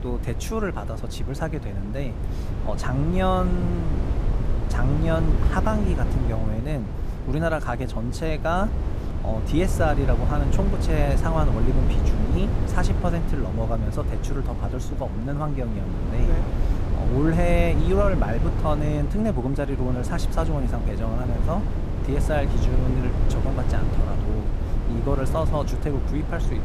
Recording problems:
wind noise on the microphone; heavy; 7 dB below the speech

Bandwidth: 14.5 kHz